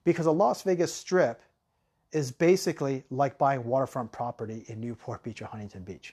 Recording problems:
none

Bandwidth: 13.5 kHz